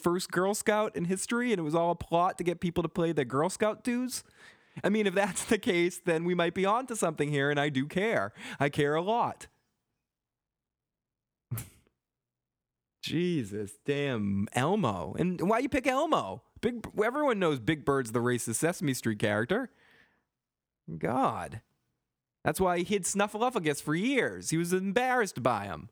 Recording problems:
squashed, flat; somewhat

